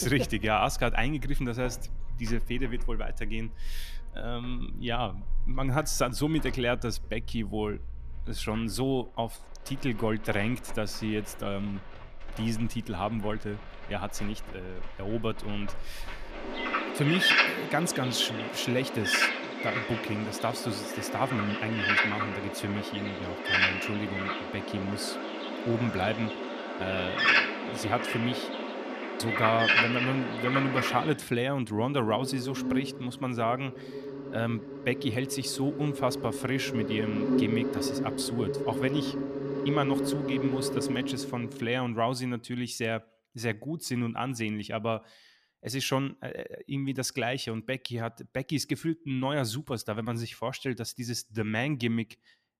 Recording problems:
animal sounds; very loud; until 41 s; 1 dB above the speech
abrupt cut into speech; at the start

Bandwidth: 14.5 kHz